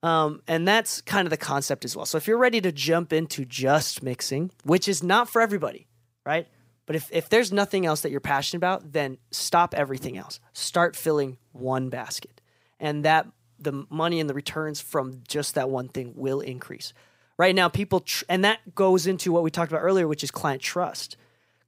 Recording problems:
none

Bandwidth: 15.5 kHz